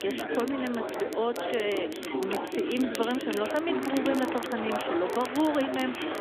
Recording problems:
phone-call audio; nothing above 3.5 kHz
chatter from many people; loud; throughout; 2 dB below the speech
household noises; noticeable; throughout; 15 dB below the speech
crackle, like an old record; noticeable; 15 dB below the speech

